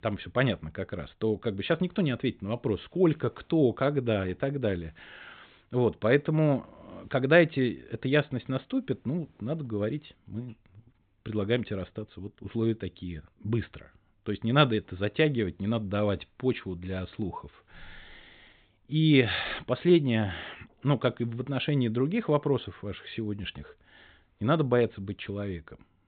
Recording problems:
high frequencies cut off; severe; nothing above 4 kHz

